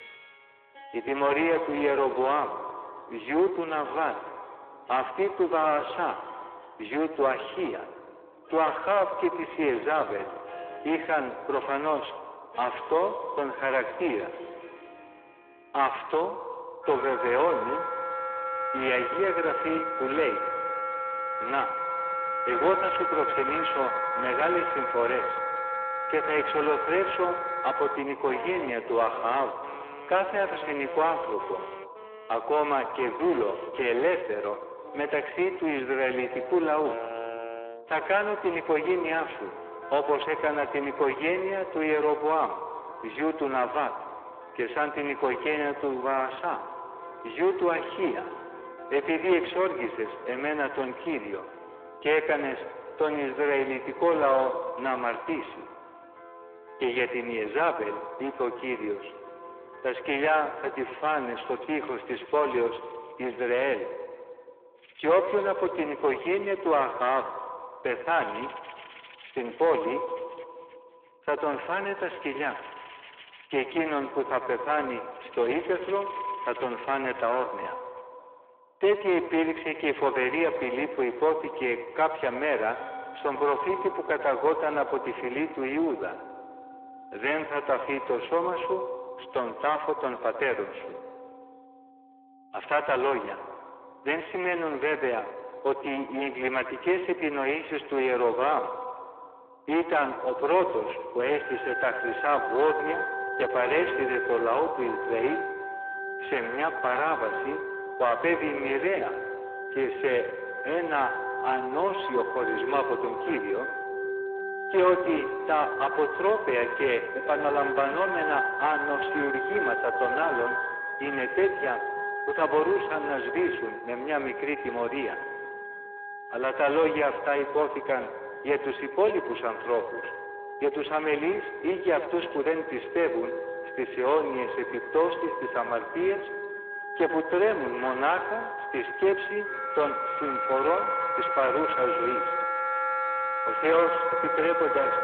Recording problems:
echo of what is said; strong; throughout; 90 ms later, 9 dB below the speech
phone-call audio
distortion; slight; 6% of the sound clipped
background music; loud; throughout; 5 dB below the speech

